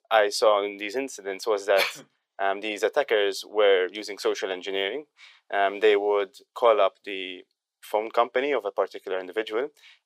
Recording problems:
thin; very; fading below 400 Hz

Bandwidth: 15.5 kHz